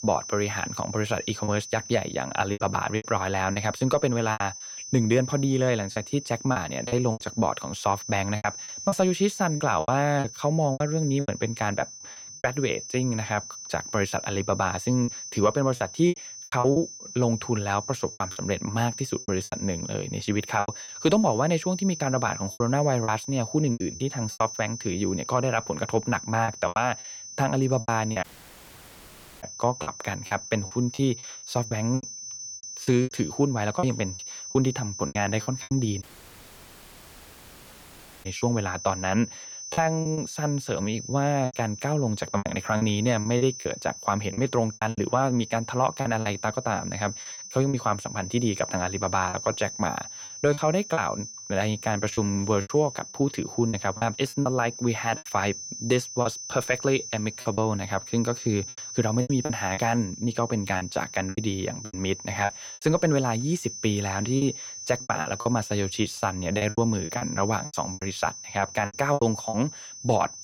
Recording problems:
high-pitched whine; loud; throughout; 6 kHz, 10 dB below the speech
choppy; very; 10% of the speech affected
audio cutting out; at 28 s for 1 s and at 36 s for 2 s

